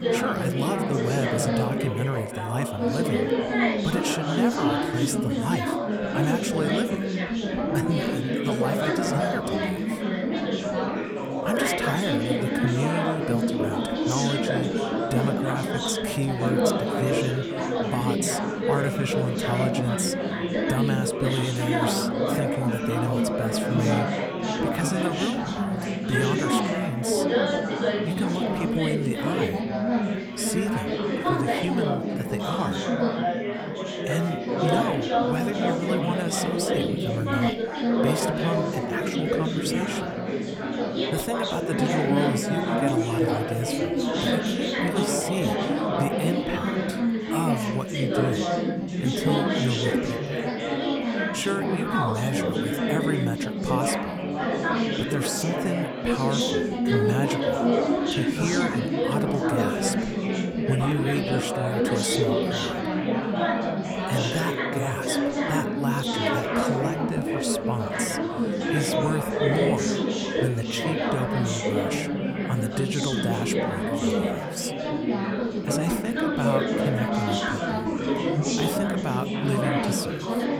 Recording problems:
chatter from many people; very loud; throughout; 4 dB above the speech

